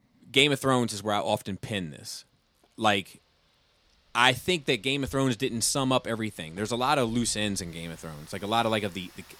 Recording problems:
rain or running water; faint; throughout; 30 dB below the speech

